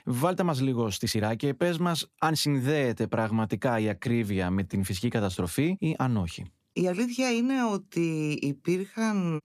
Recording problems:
uneven, jittery; strongly; from 1 to 9 s

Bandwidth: 14.5 kHz